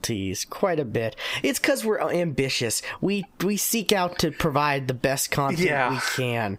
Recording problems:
squashed, flat; heavily

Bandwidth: 15.5 kHz